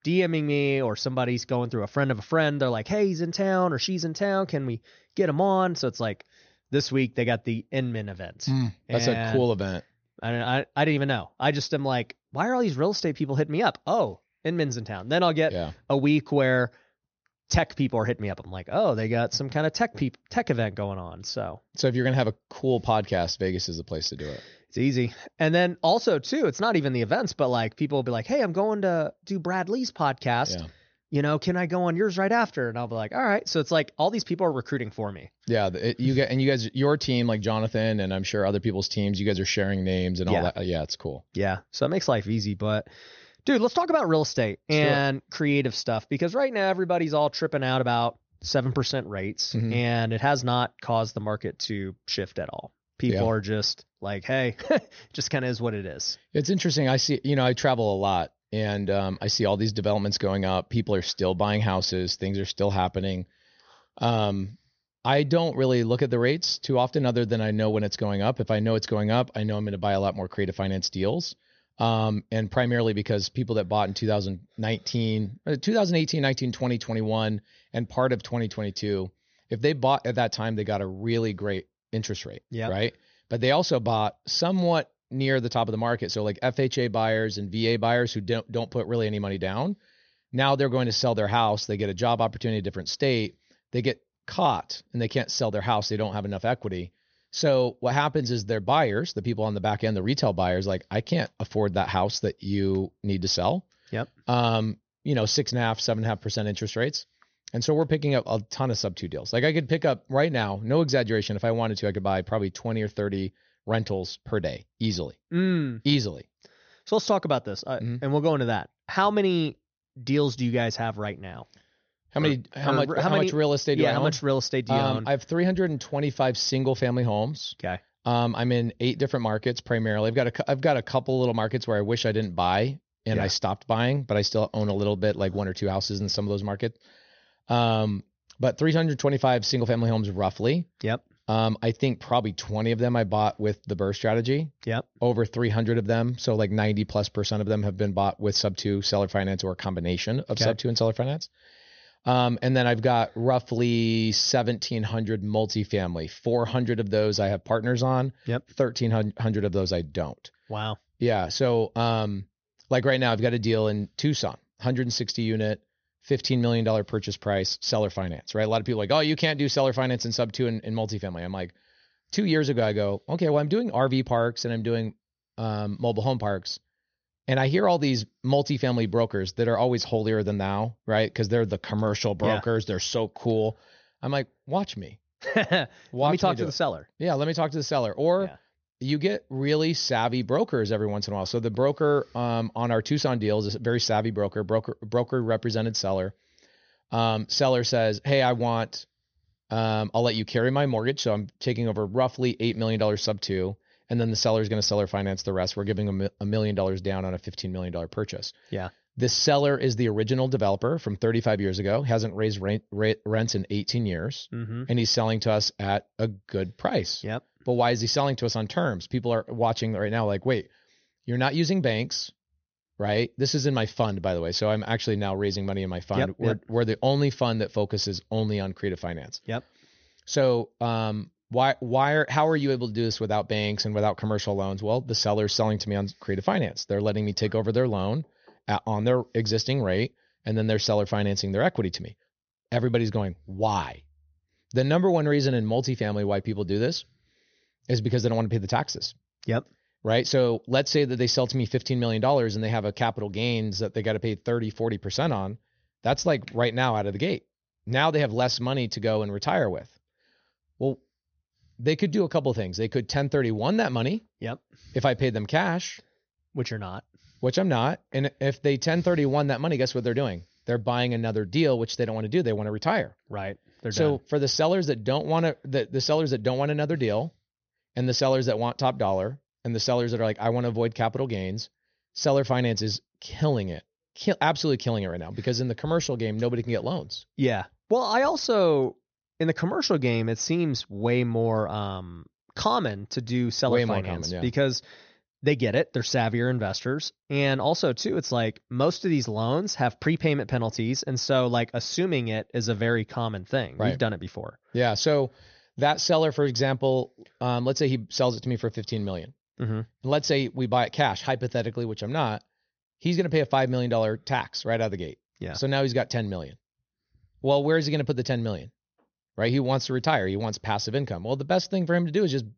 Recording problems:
high frequencies cut off; noticeable; nothing above 6.5 kHz

